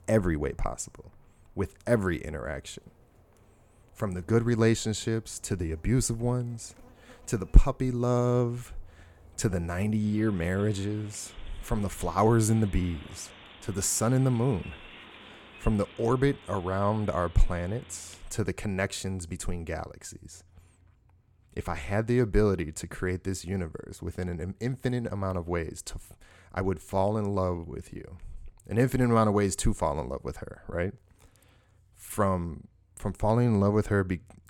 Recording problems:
animal sounds; faint; until 18 s; 25 dB below the speech

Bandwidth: 17.5 kHz